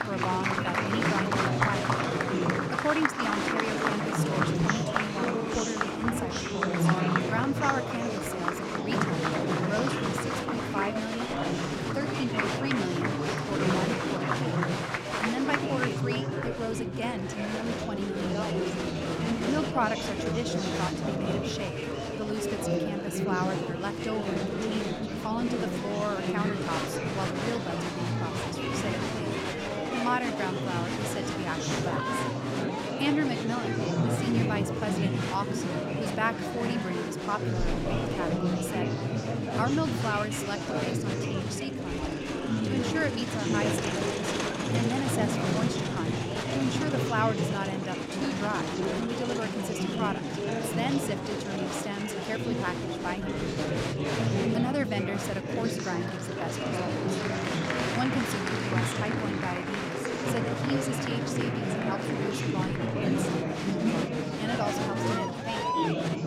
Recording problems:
chatter from many people; very loud; throughout; 4 dB above the speech

